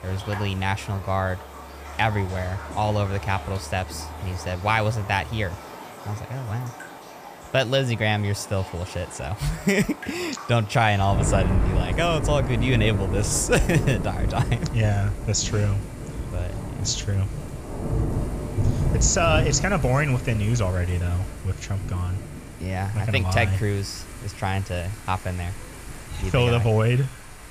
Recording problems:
rain or running water; loud; throughout; 7 dB below the speech

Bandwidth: 15 kHz